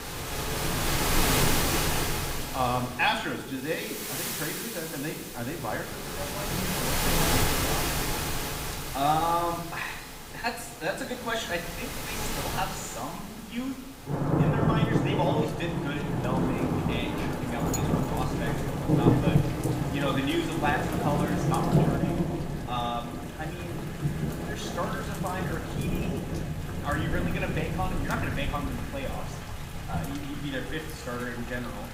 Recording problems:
room echo; slight; dies away in 0.8 s
off-mic speech; somewhat distant
rain or running water; very loud; throughout; 4 dB above the speech

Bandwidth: 15.5 kHz